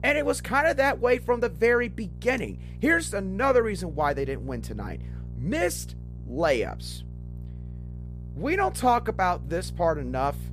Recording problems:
electrical hum; faint; throughout; 60 Hz, 25 dB below the speech

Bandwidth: 14.5 kHz